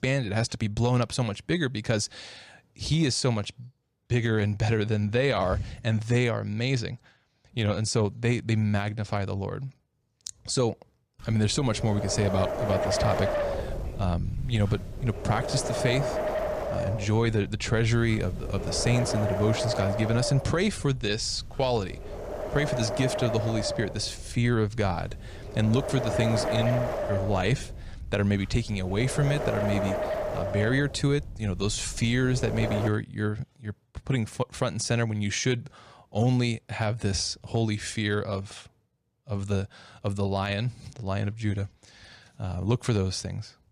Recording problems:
wind noise on the microphone; heavy; from 11 to 33 s; as loud as the speech

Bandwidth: 14.5 kHz